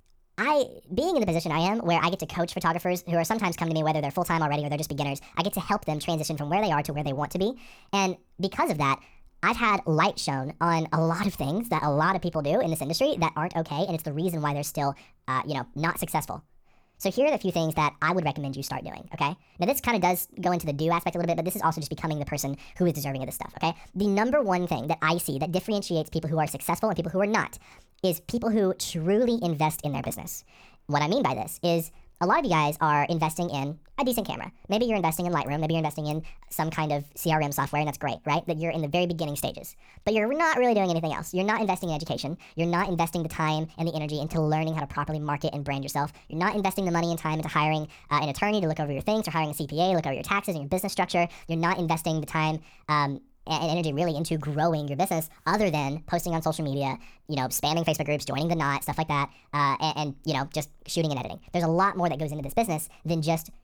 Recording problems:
wrong speed and pitch; too fast and too high; 1.5 times normal speed

